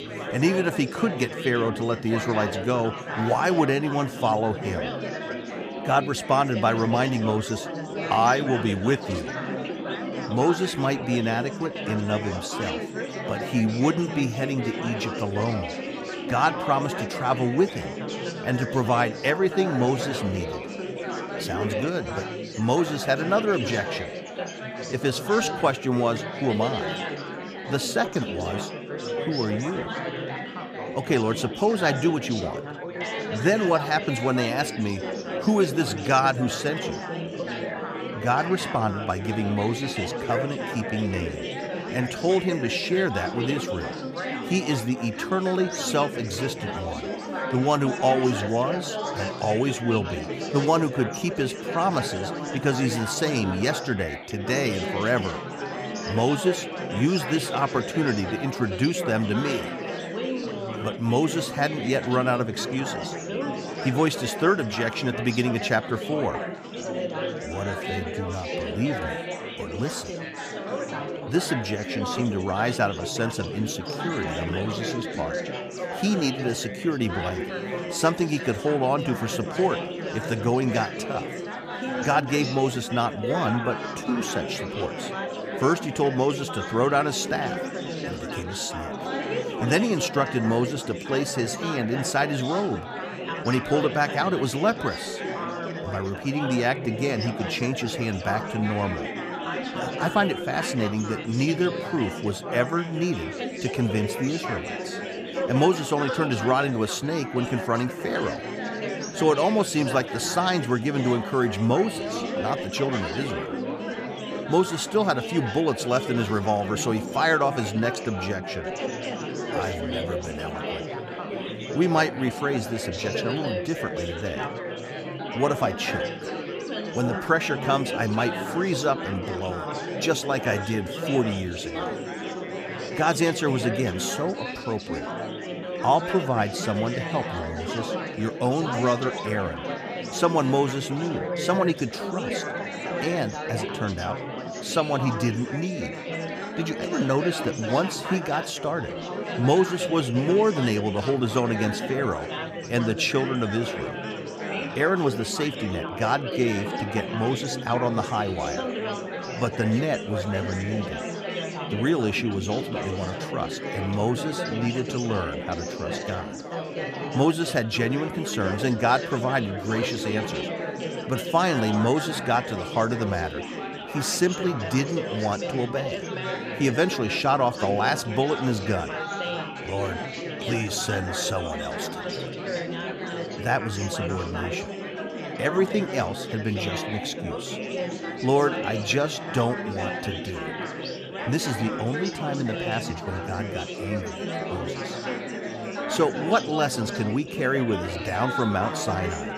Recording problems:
chatter from many people; loud; throughout; 5 dB below the speech

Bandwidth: 15 kHz